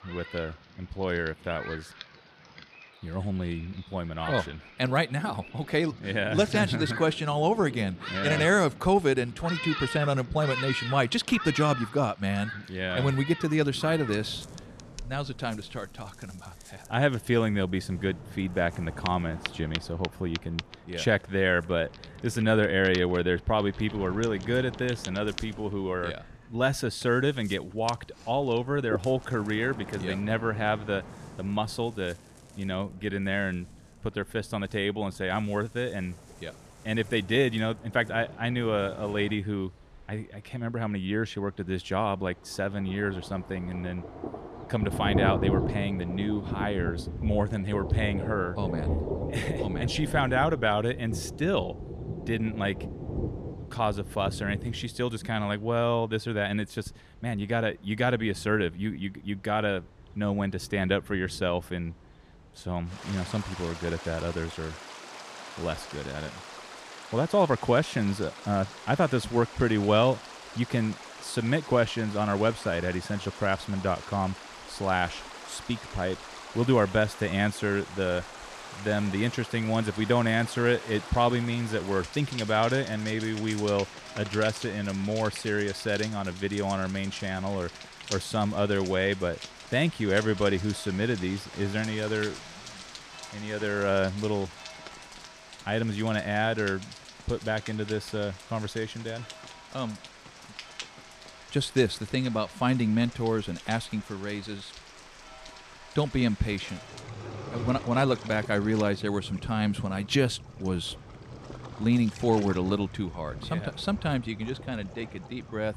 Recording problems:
rain or running water; noticeable; throughout; 10 dB below the speech

